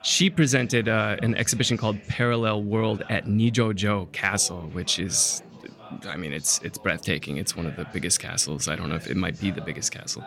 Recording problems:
chatter from many people; faint; throughout; 20 dB below the speech

